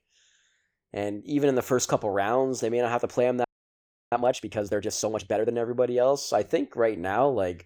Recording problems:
audio freezing; at 3.5 s for 0.5 s

